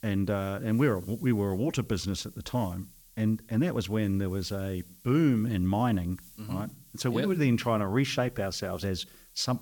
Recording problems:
hiss; faint; throughout; 25 dB below the speech

